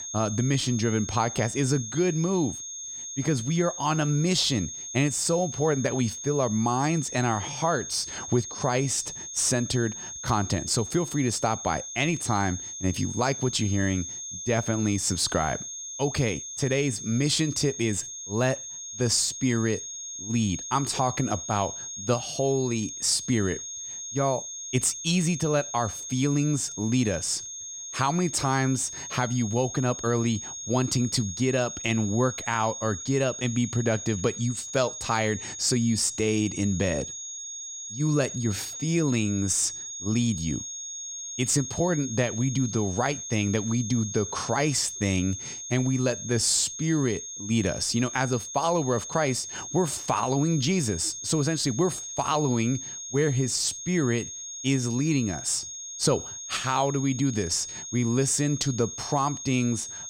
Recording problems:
high-pitched whine; loud; throughout; 6.5 kHz, 8 dB below the speech

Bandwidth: 16 kHz